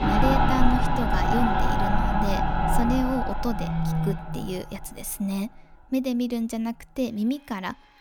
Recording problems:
machinery noise; very loud; throughout; 3 dB above the speech

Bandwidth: 18 kHz